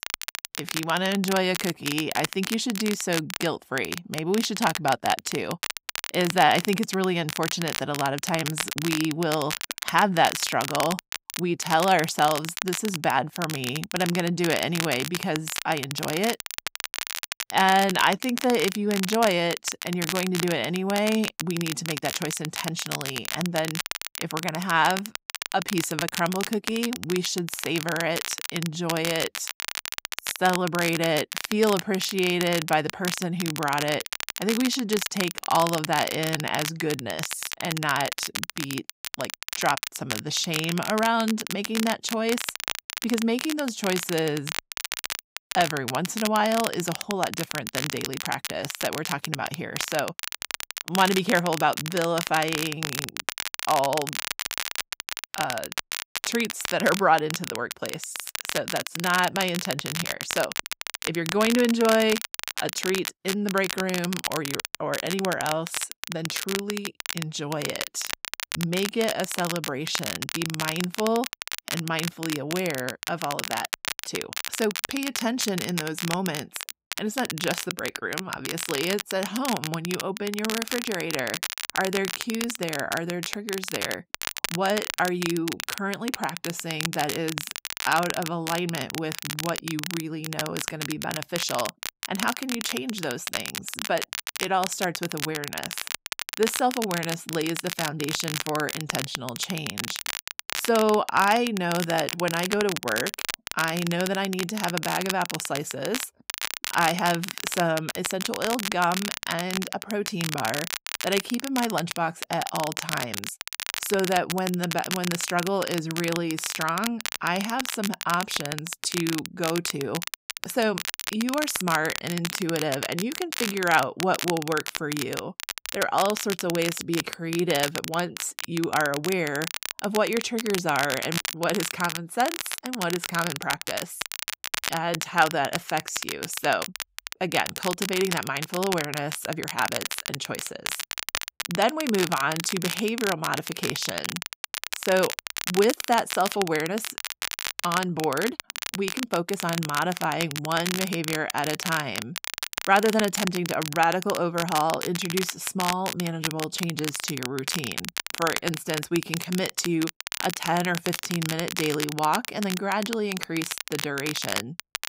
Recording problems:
crackle, like an old record; loud; 4 dB below the speech

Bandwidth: 15.5 kHz